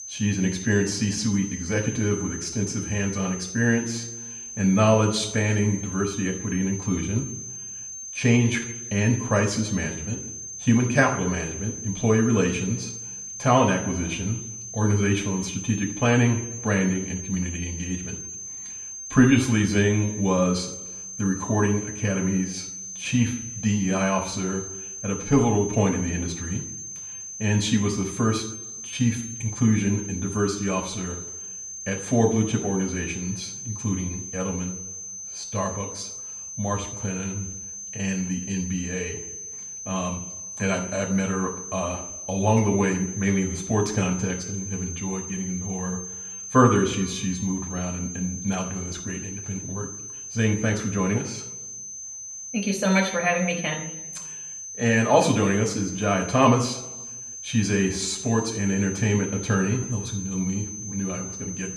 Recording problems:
room echo; slight; dies away in 0.7 s
off-mic speech; somewhat distant
high-pitched whine; loud; throughout; 6 kHz, 9 dB below the speech

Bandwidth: 15.5 kHz